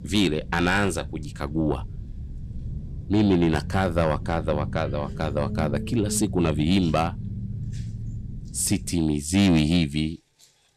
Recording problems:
distortion; slight; 10 dB below the speech
low rumble; noticeable; until 9 s; 20 dB below the speech

